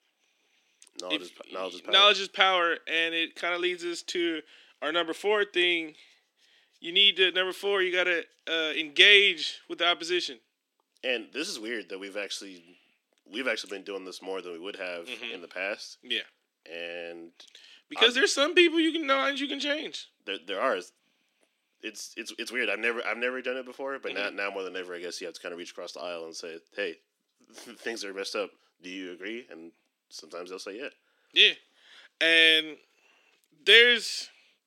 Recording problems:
thin; somewhat; fading below 250 Hz

